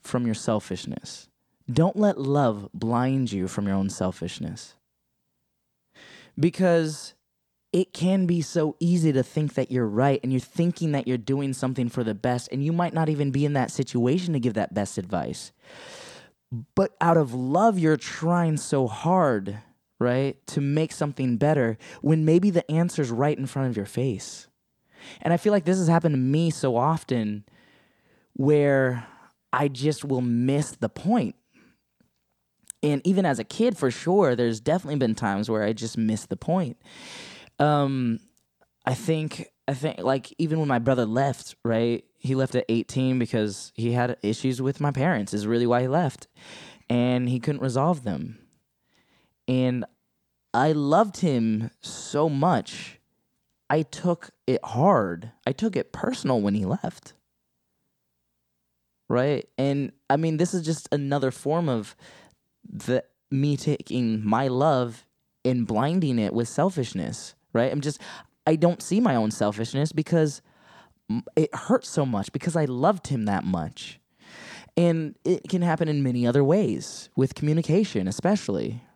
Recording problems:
none

